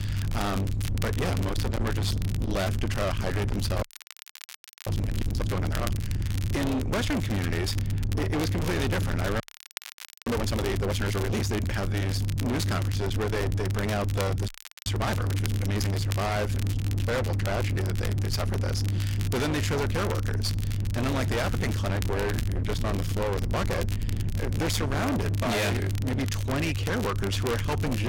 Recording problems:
distortion; heavy; 50% of the sound clipped
low rumble; loud; throughout; 7 dB below the speech
crackle, like an old record; noticeable; 15 dB below the speech
audio freezing; at 4 s for 1 s, at 9.5 s for 1 s and at 14 s
abrupt cut into speech; at the end

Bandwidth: 16.5 kHz